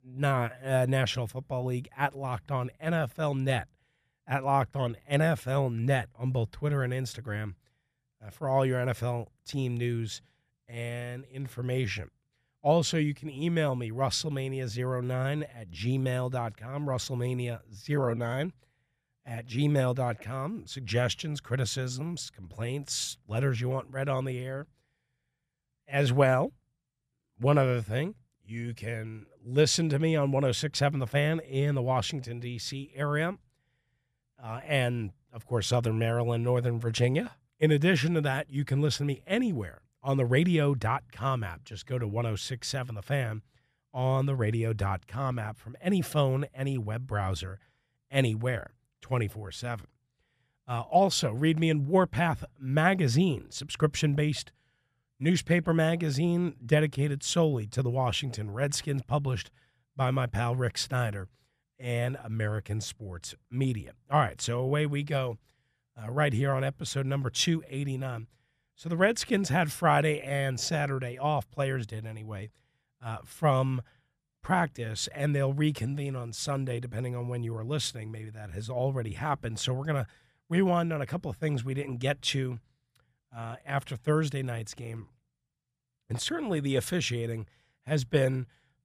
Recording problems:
none

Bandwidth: 14.5 kHz